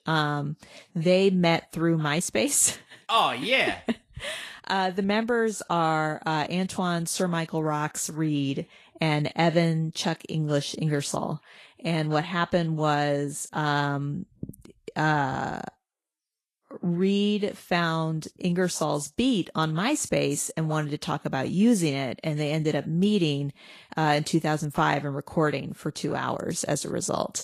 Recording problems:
garbled, watery; slightly

